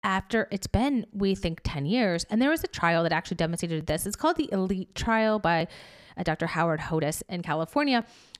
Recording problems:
uneven, jittery; strongly; from 1 to 7.5 s

